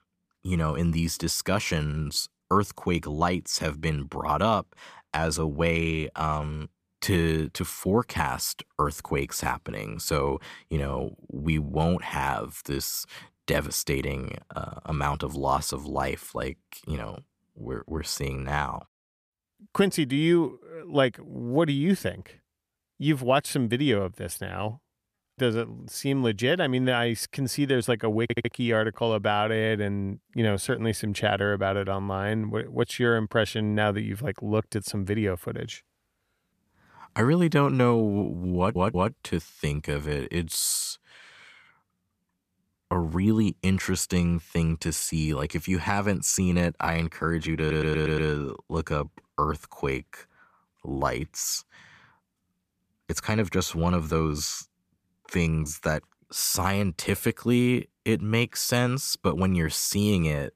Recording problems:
audio stuttering; at 28 s, at 39 s and at 48 s

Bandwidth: 14.5 kHz